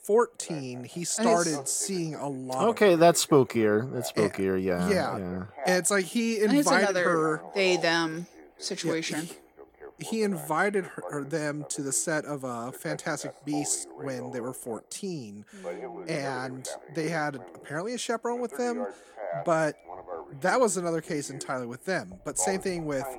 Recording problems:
voice in the background; noticeable; throughout; 15 dB below the speech

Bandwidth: 17 kHz